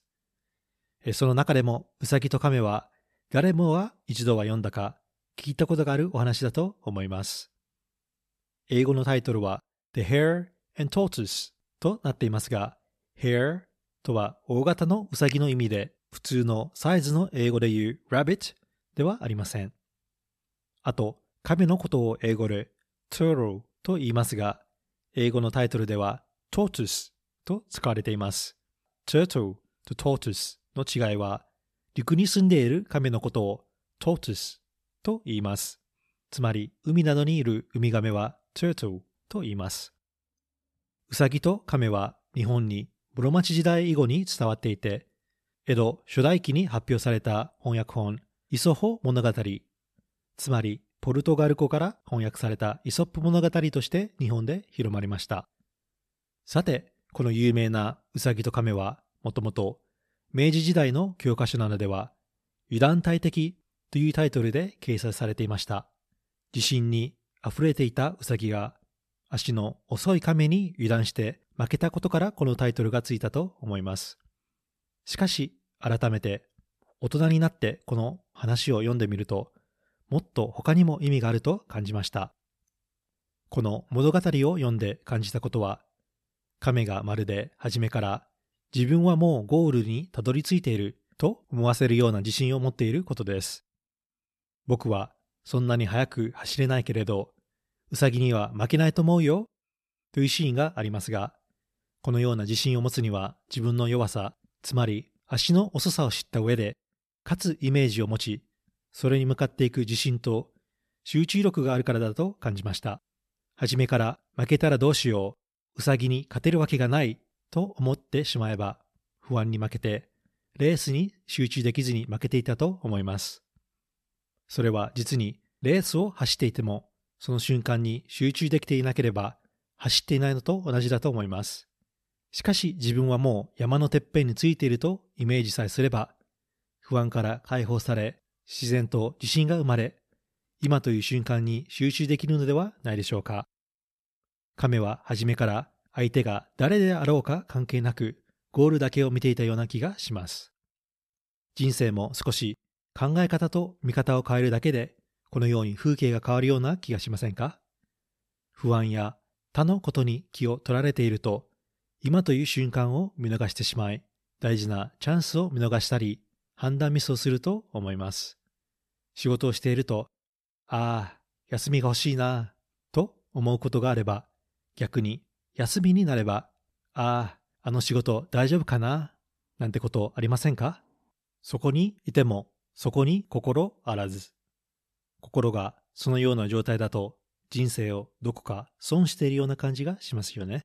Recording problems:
none

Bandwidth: 13.5 kHz